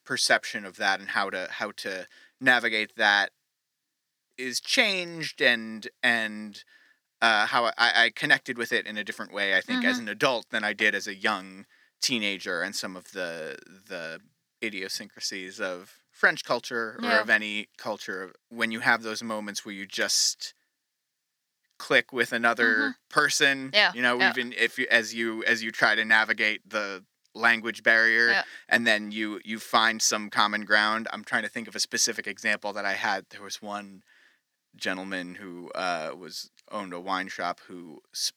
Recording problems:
thin; very slightly; fading below 300 Hz

